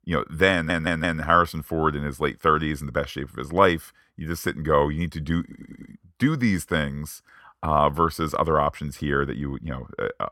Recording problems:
audio stuttering; at 0.5 s and at 5.5 s

